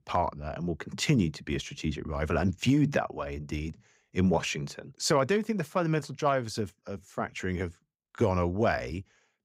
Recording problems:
none

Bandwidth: 15.5 kHz